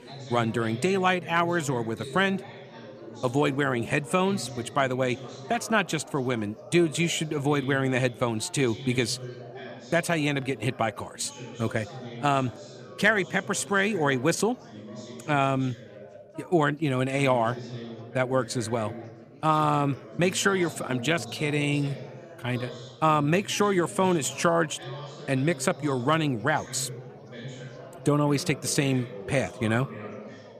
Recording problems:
chatter from many people; noticeable; throughout; 15 dB below the speech

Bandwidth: 14.5 kHz